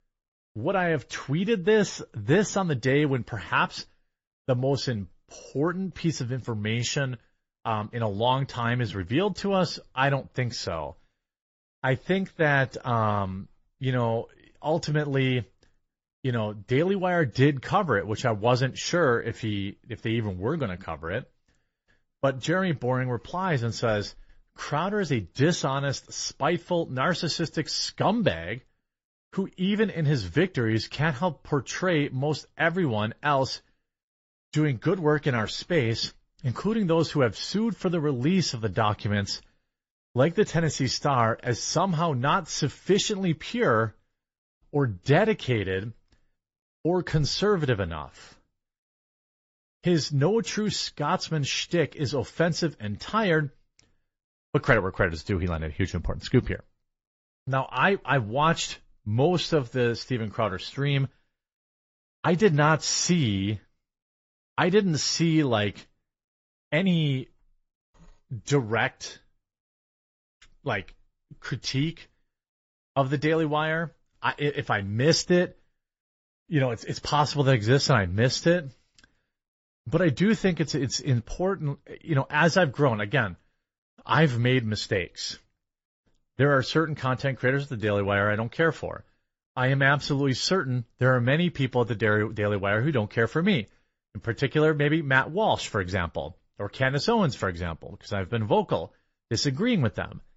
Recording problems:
garbled, watery; slightly; nothing above 7.5 kHz
high frequencies cut off; slight

